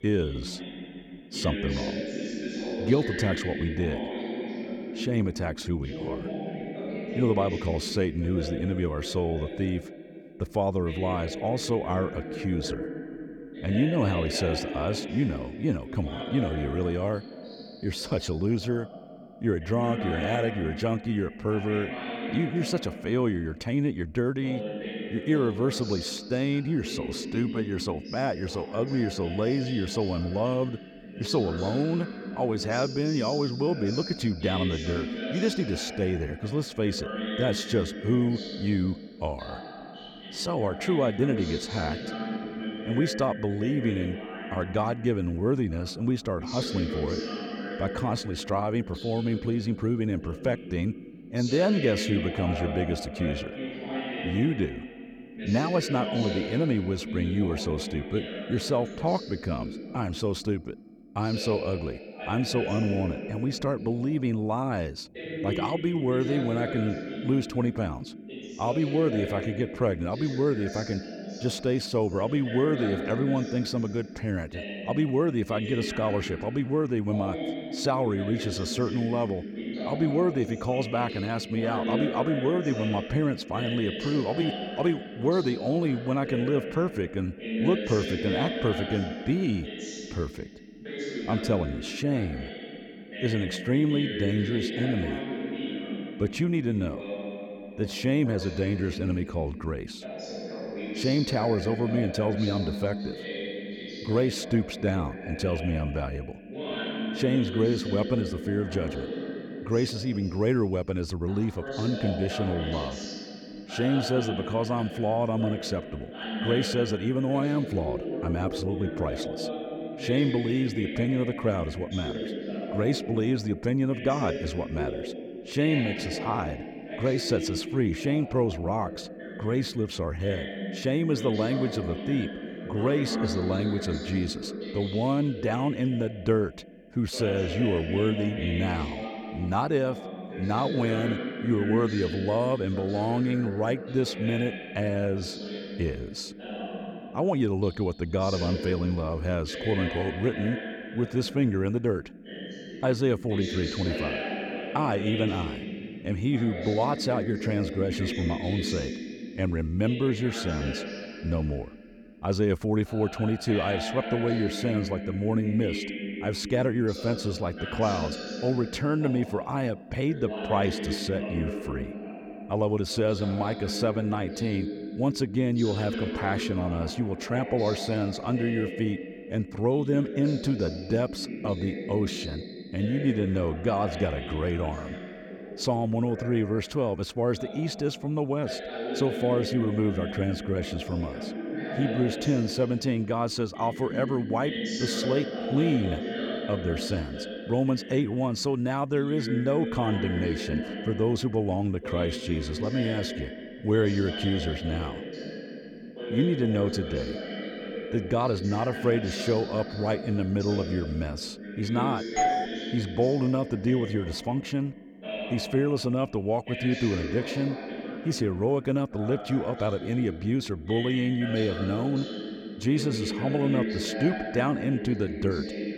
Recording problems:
voice in the background; loud; throughout; 7 dB below the speech
doorbell; loud; at 3:32; peak 3 dB above the speech

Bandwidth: 18 kHz